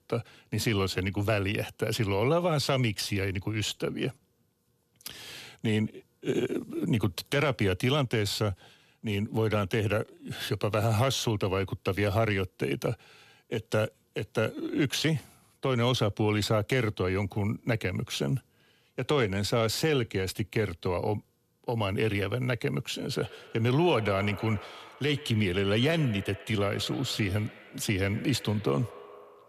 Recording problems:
echo of what is said; noticeable; from 23 s on; 130 ms later, 15 dB below the speech

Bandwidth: 14 kHz